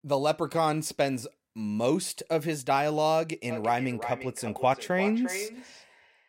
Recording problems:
echo of what is said; strong; from 3.5 s on; 350 ms later, 10 dB below the speech

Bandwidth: 16 kHz